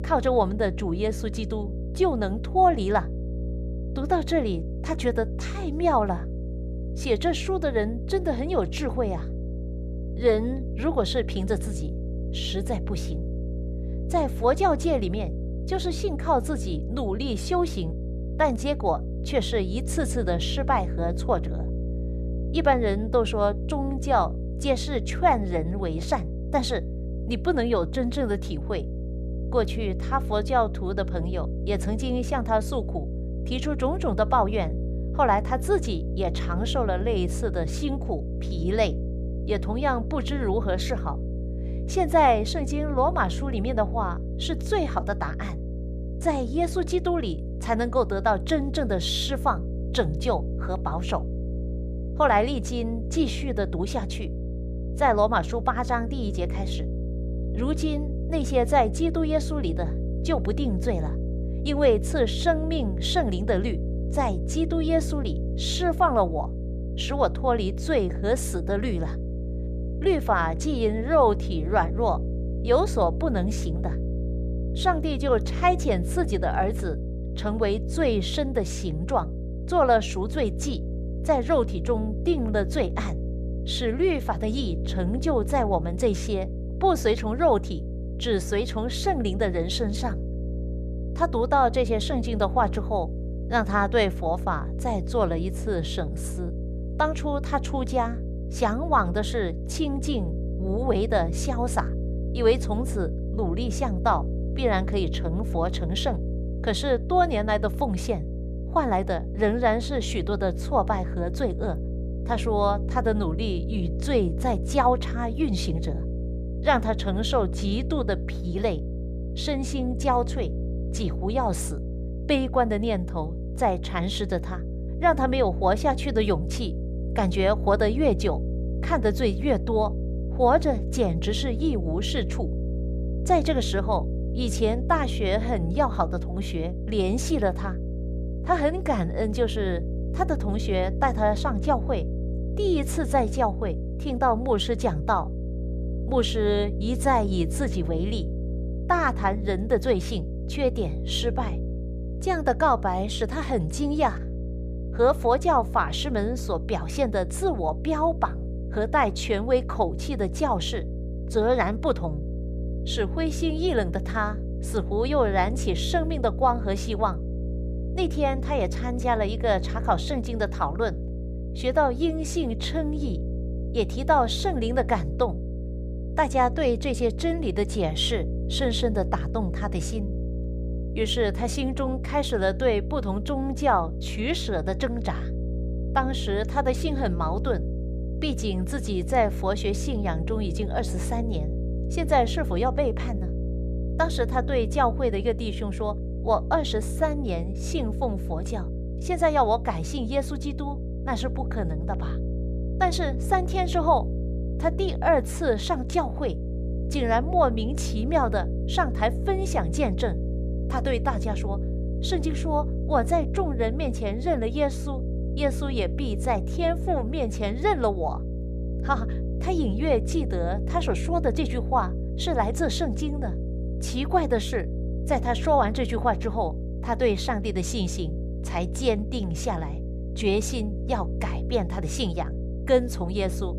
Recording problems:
electrical hum; noticeable; throughout; 60 Hz, 15 dB below the speech

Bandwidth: 14.5 kHz